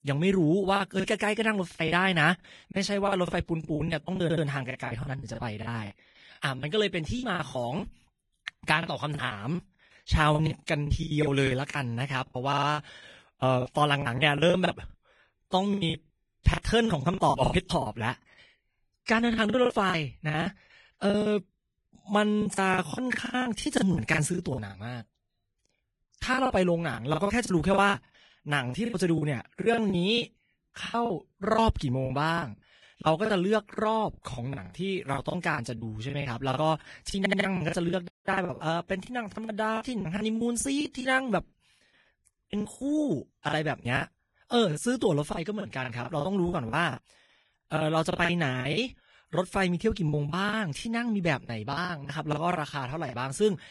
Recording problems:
garbled, watery; badly; nothing above 10.5 kHz
choppy; very; 16% of the speech affected
audio stuttering; at 4 s, at 12 s and at 37 s
audio cutting out; at 38 s

